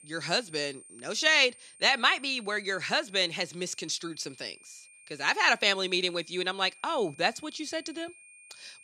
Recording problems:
high-pitched whine; faint; throughout; 9 kHz, 25 dB below the speech

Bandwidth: 14.5 kHz